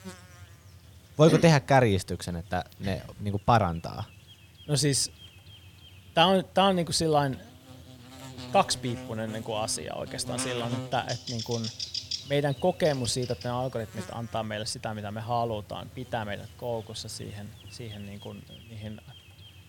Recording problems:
electrical hum; noticeable; throughout; 60 Hz, 15 dB below the speech

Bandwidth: 17.5 kHz